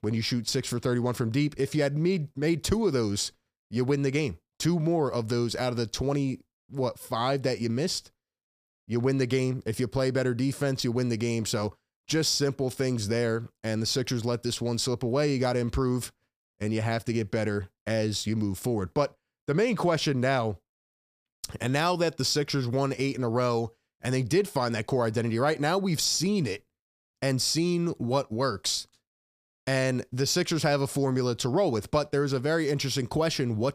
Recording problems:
none

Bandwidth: 15 kHz